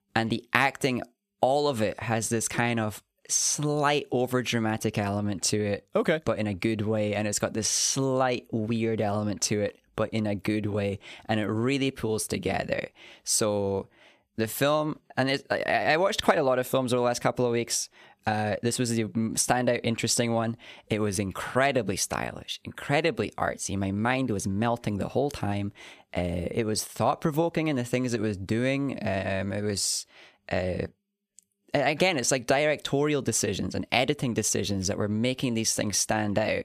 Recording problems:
none

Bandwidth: 14.5 kHz